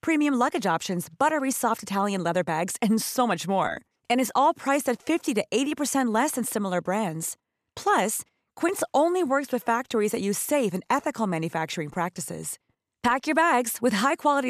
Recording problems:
abrupt cut into speech; at the end

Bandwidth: 14.5 kHz